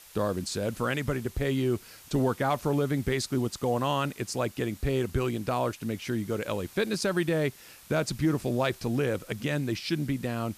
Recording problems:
hiss; faint; throughout; 20 dB below the speech

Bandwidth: 14.5 kHz